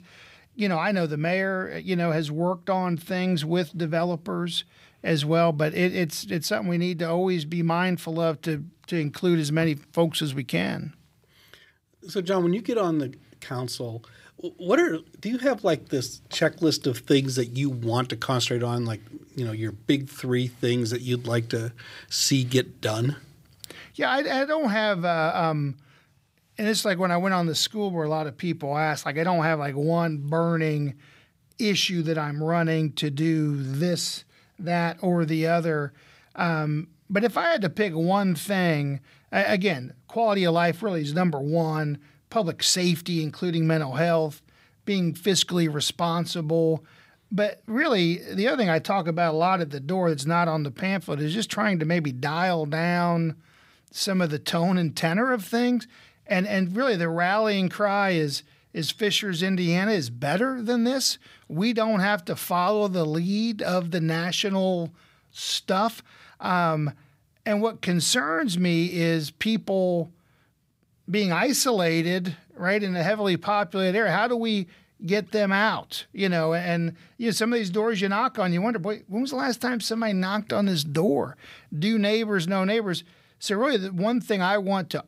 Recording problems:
none

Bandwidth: 15.5 kHz